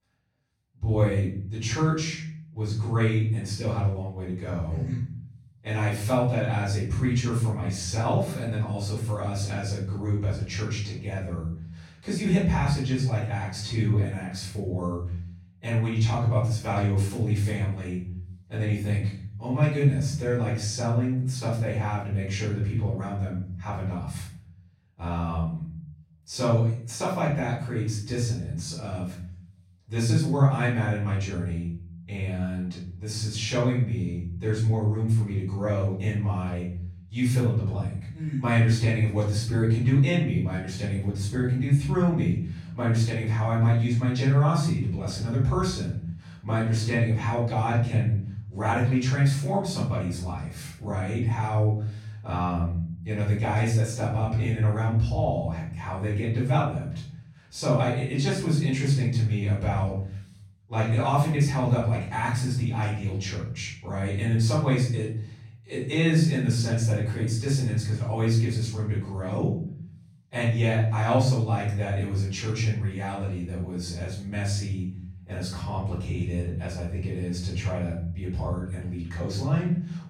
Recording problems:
off-mic speech; far
room echo; noticeable; dies away in 0.7 s

